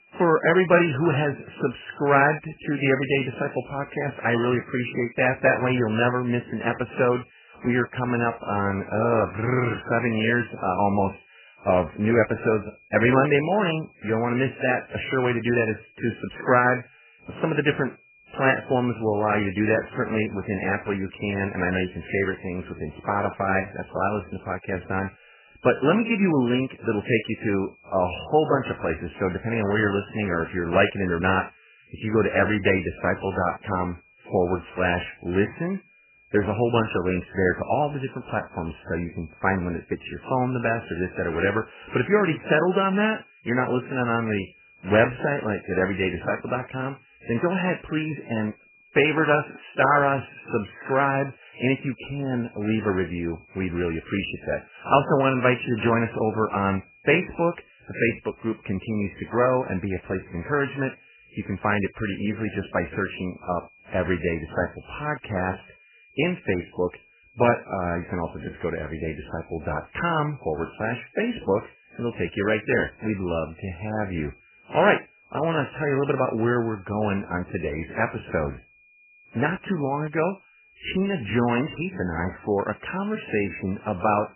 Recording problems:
garbled, watery; badly; nothing above 3 kHz
high-pitched whine; faint; throughout; 2.5 kHz, 30 dB below the speech

